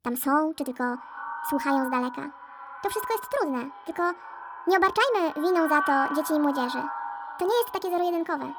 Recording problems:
echo of what is said; strong; throughout; 260 ms later, 9 dB below the speech
wrong speed and pitch; too fast and too high; 1.5 times normal speed

